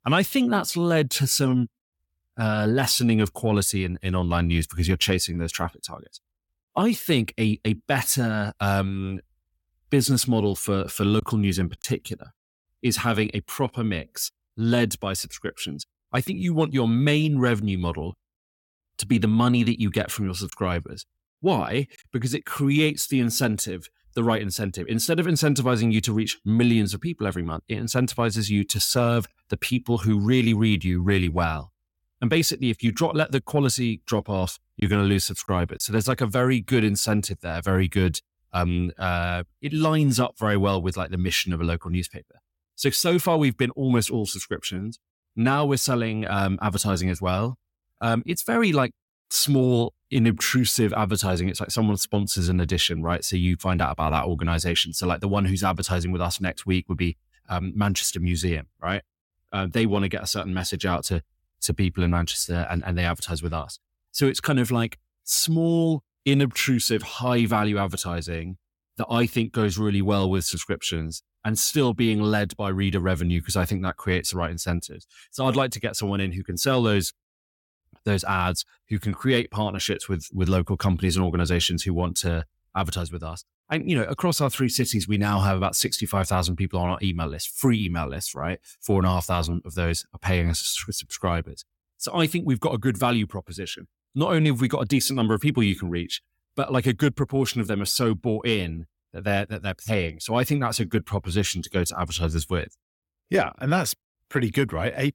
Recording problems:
choppy; occasionally; at 11 s, at 21 s and from 35 to 36 s; 2% of the speech affected

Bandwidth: 17 kHz